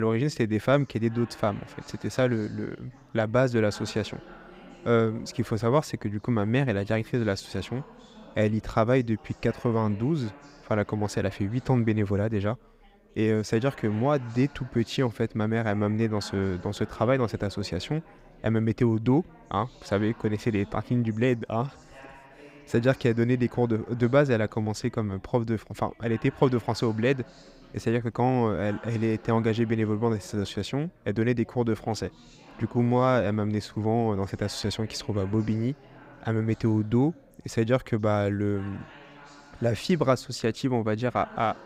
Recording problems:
background chatter; faint; throughout; 4 voices, 25 dB below the speech
abrupt cut into speech; at the start

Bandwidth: 15.5 kHz